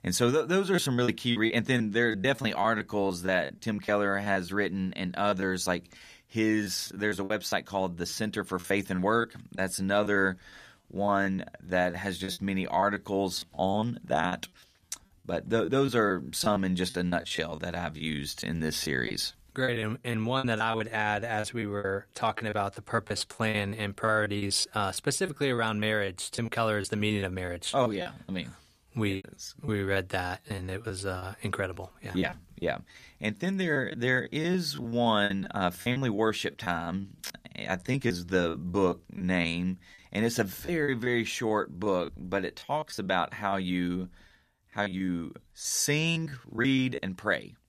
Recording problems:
choppy; very; 11% of the speech affected

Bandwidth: 14.5 kHz